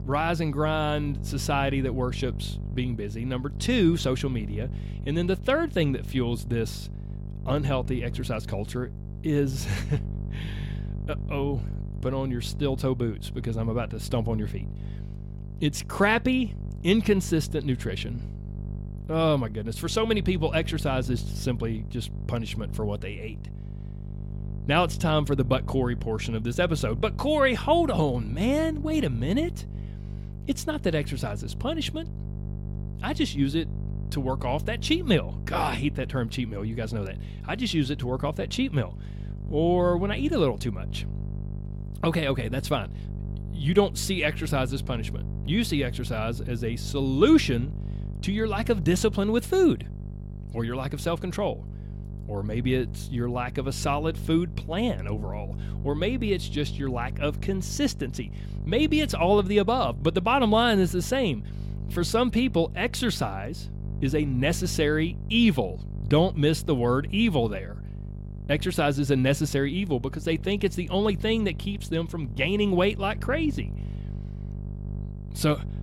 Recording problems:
electrical hum; noticeable; throughout; 50 Hz, 20 dB below the speech

